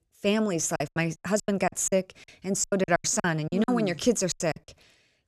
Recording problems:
choppy; very; 18% of the speech affected

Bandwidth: 14.5 kHz